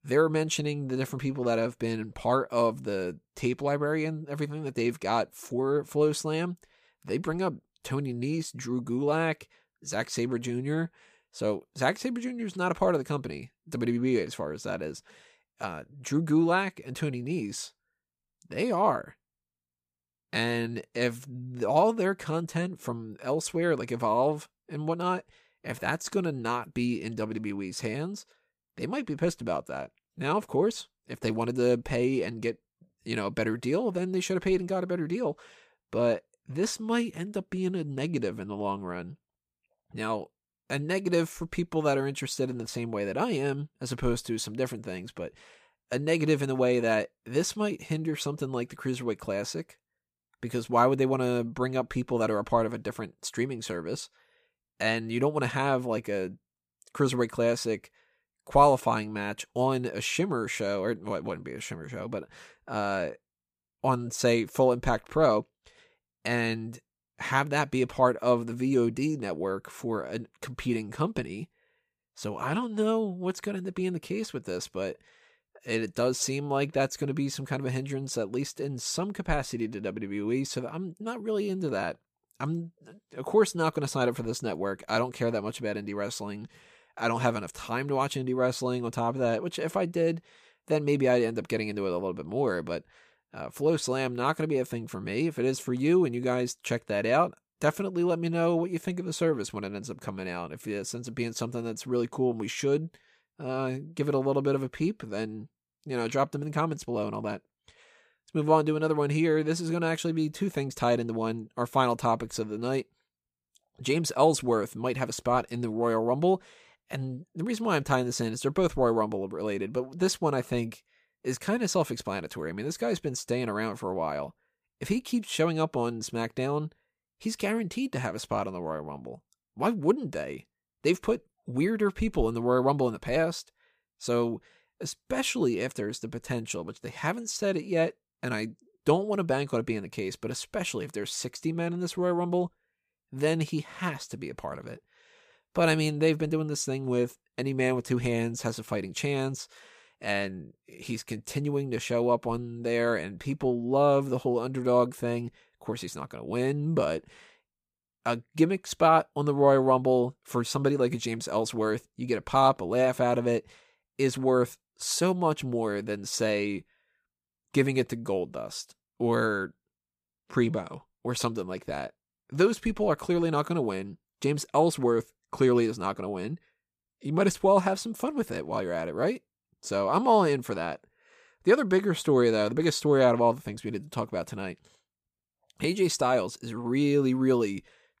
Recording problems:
none

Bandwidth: 15 kHz